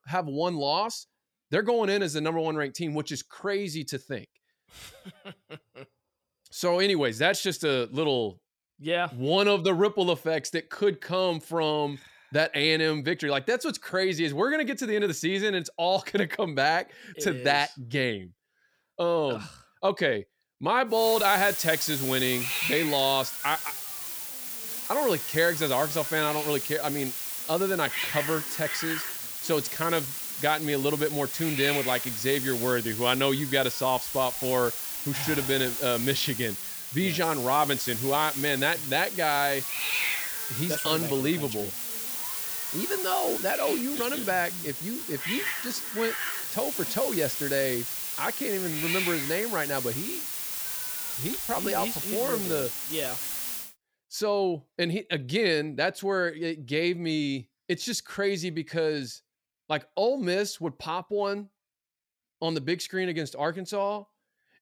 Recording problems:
hiss; loud; from 21 to 54 s; 3 dB below the speech

